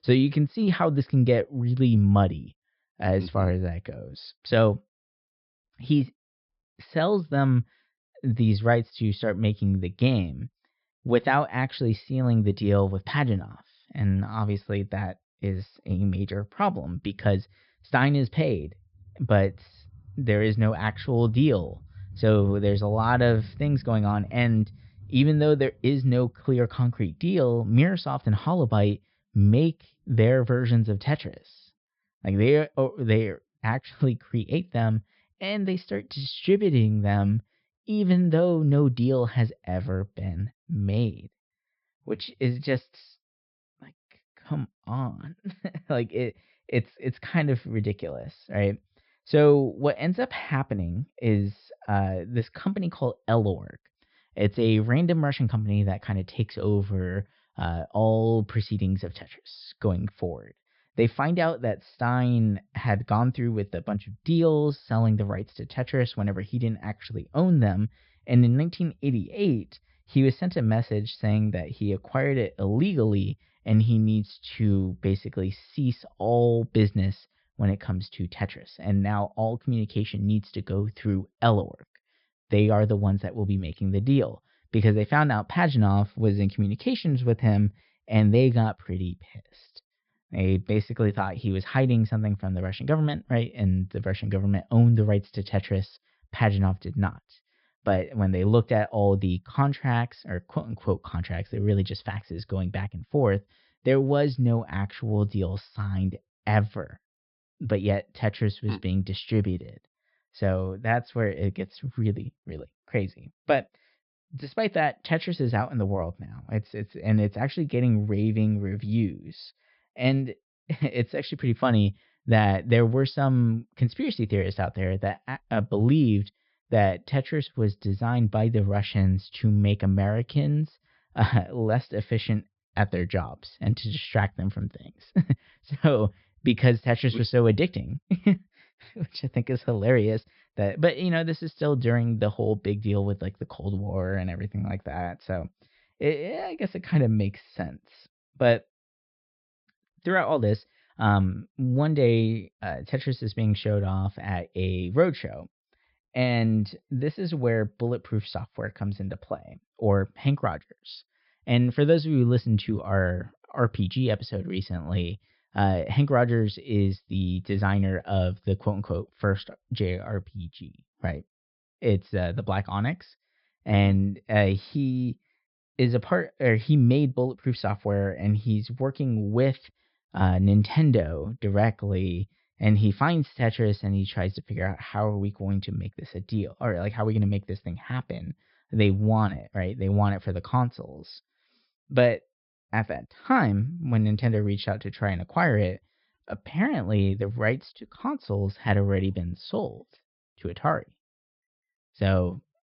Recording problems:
high frequencies cut off; noticeable; nothing above 5.5 kHz

